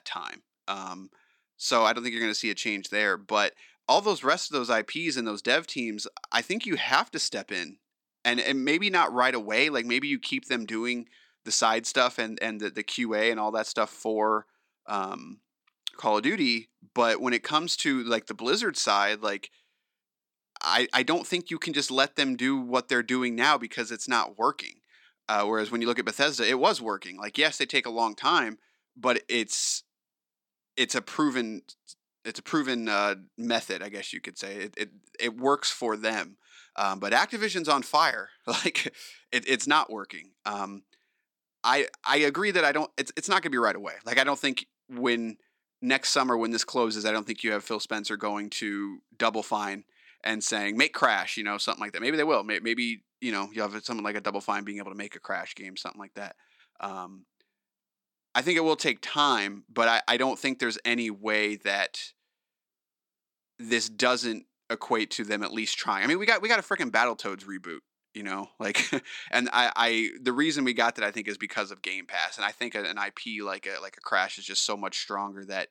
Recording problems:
thin; somewhat; fading below 300 Hz

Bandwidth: 17.5 kHz